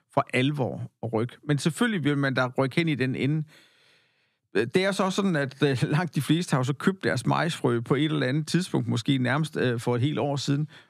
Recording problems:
none

